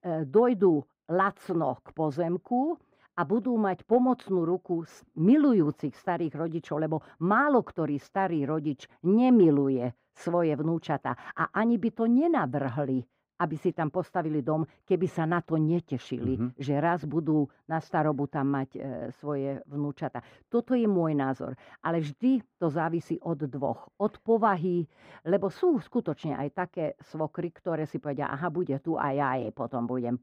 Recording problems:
muffled; very; fading above 3 kHz

